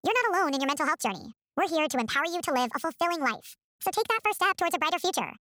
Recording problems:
wrong speed and pitch; too fast and too high; 1.5 times normal speed

